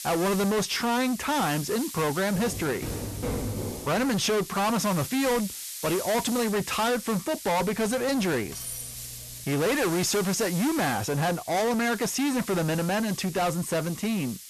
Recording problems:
distortion; heavy; 6 dB below the speech
hiss; noticeable; throughout; 10 dB below the speech
footsteps; noticeable; from 2.5 to 4 s; peak 5 dB below the speech
clattering dishes; noticeable; from 7.5 to 9.5 s; peak 8 dB below the speech

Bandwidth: 13.5 kHz